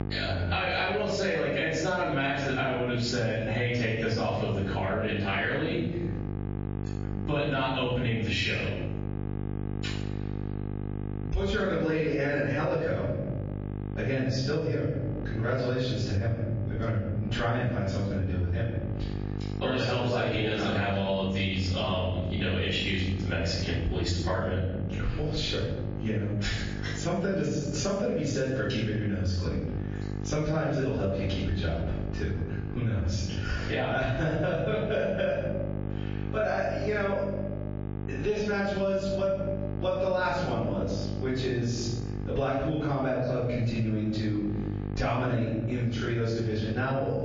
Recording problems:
off-mic speech; far
room echo; noticeable; dies away in 0.8 s
garbled, watery; slightly
squashed, flat; somewhat
electrical hum; noticeable; throughout; 50 Hz, 15 dB below the speech

